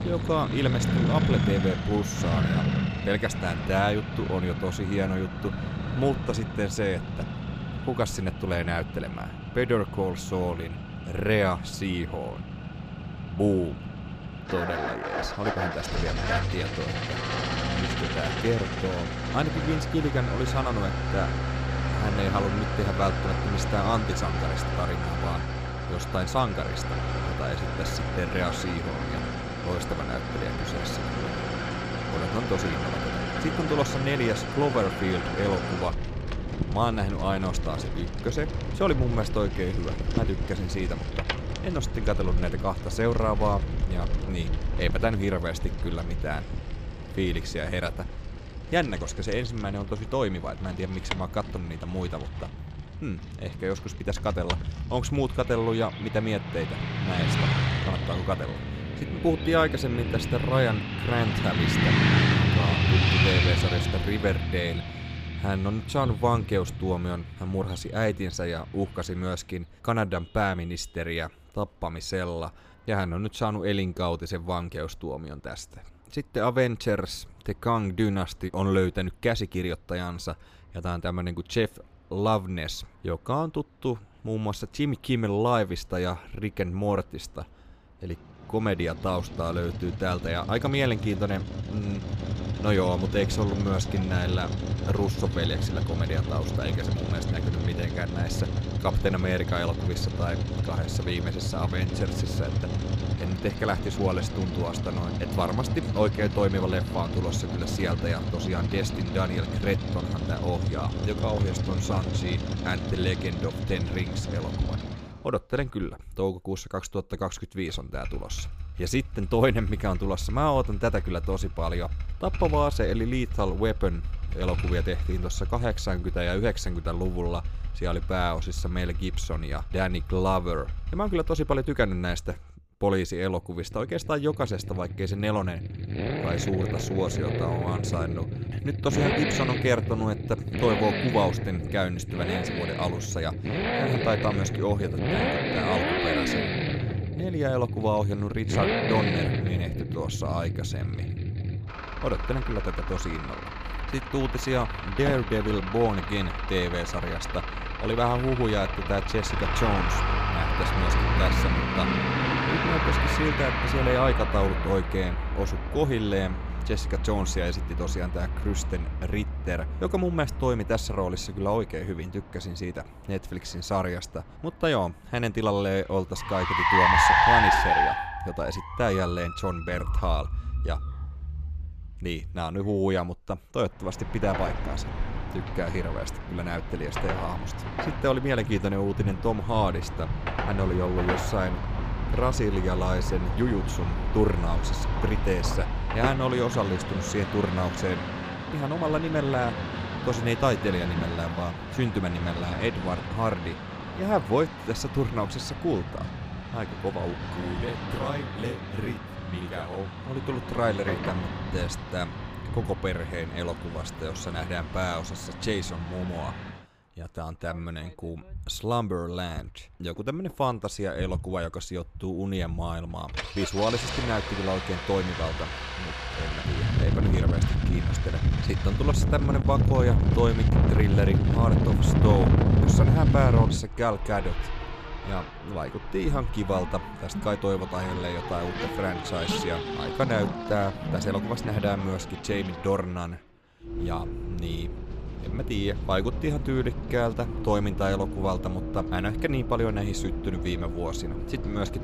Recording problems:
traffic noise; loud; throughout; as loud as the speech

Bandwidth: 15 kHz